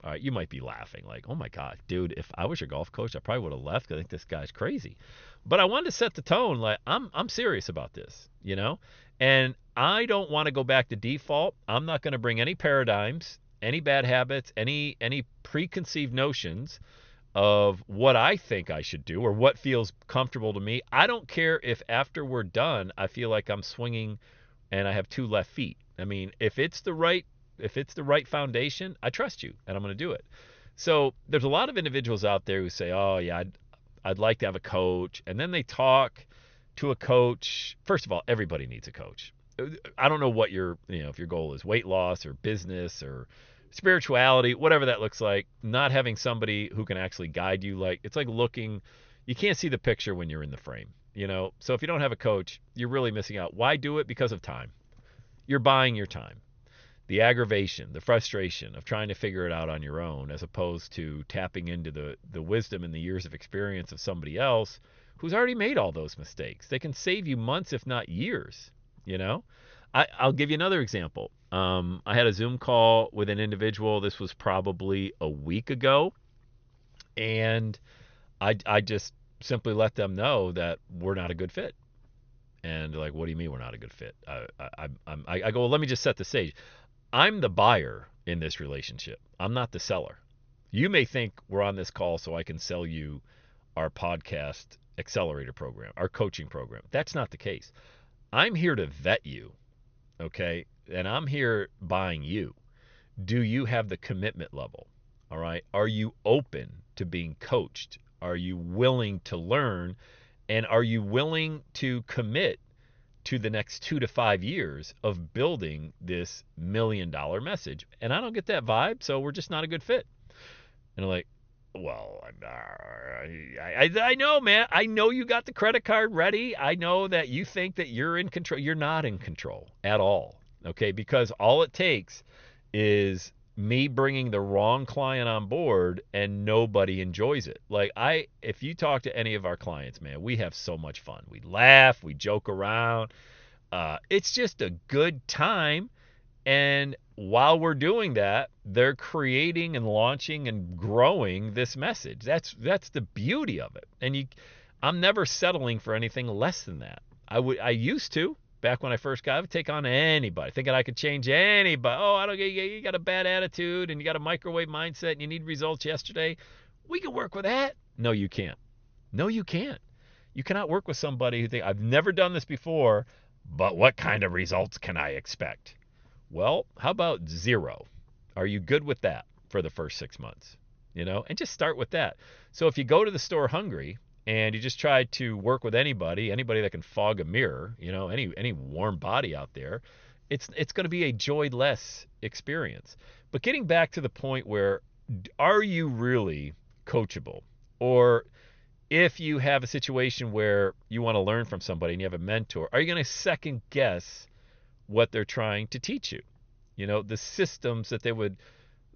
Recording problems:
high frequencies cut off; noticeable; nothing above 6.5 kHz

